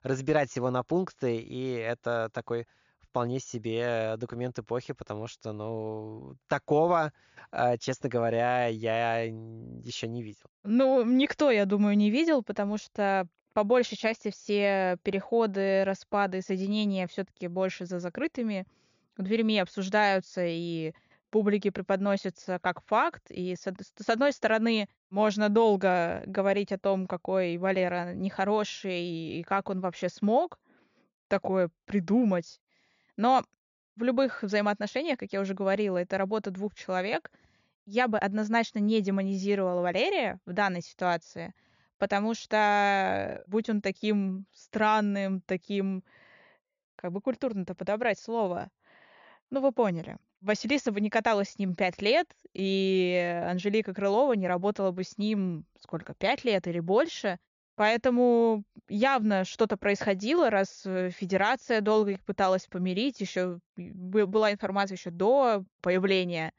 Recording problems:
high frequencies cut off; noticeable; nothing above 7 kHz

